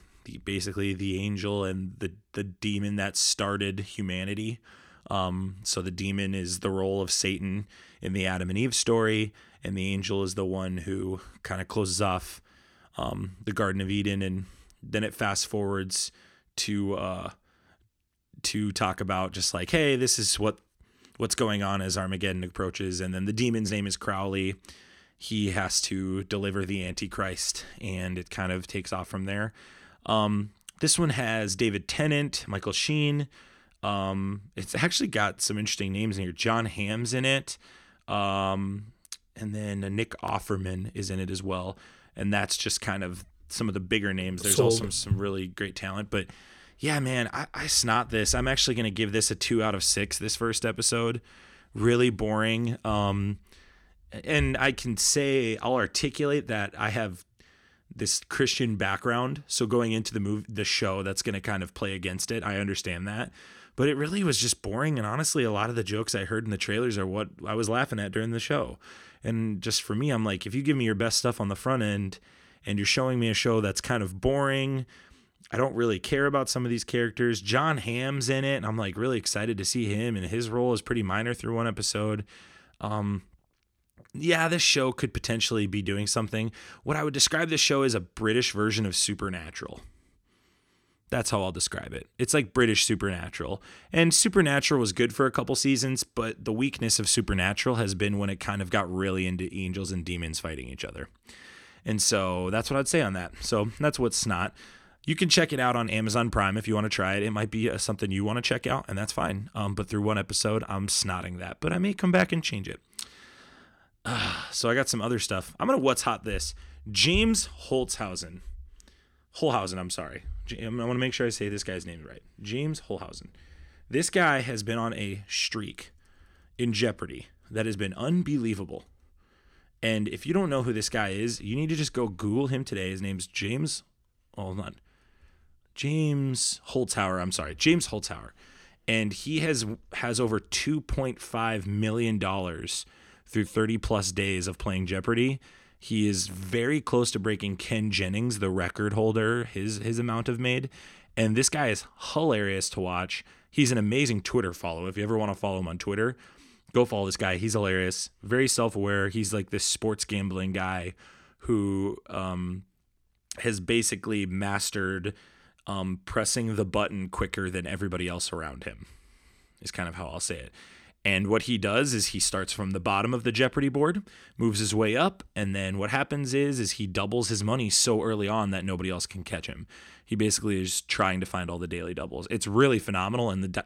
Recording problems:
none

